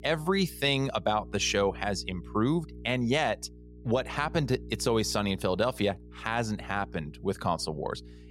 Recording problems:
electrical hum; faint; throughout; 60 Hz, 25 dB below the speech

